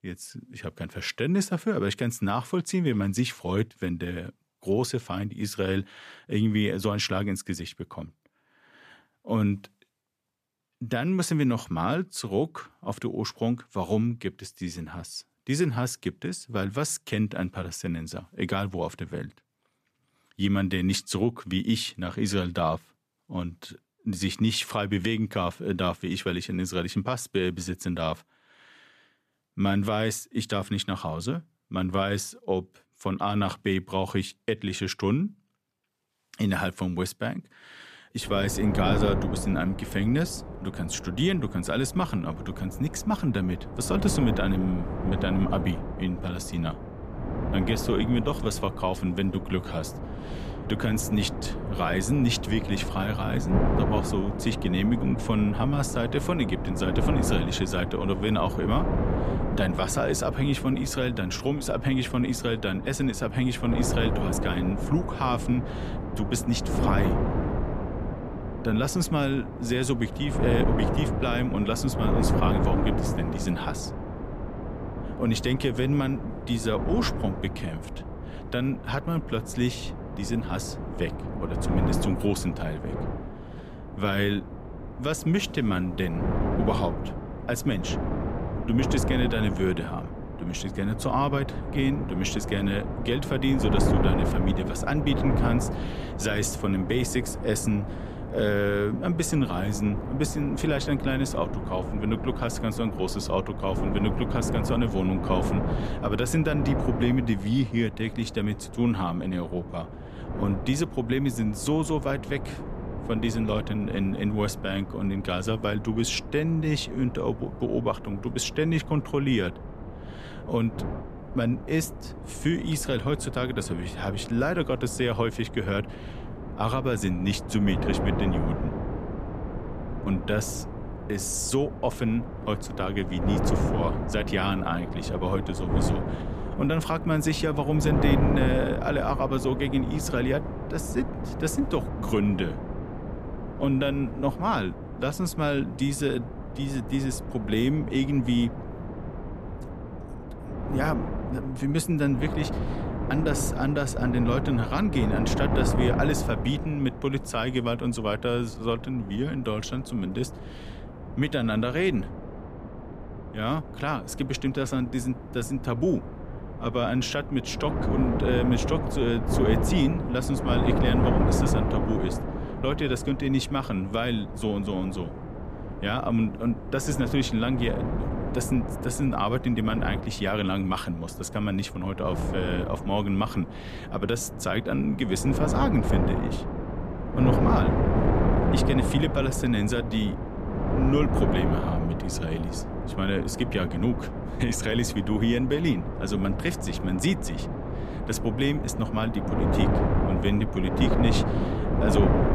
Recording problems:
wind noise on the microphone; heavy; from 38 s on; 5 dB below the speech

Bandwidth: 14.5 kHz